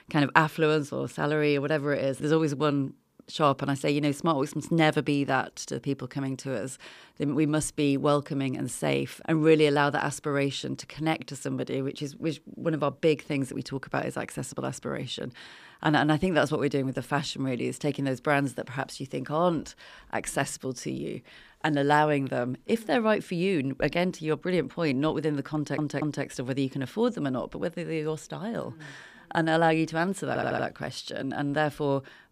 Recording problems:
audio stuttering; at 26 s and at 30 s

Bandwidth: 15 kHz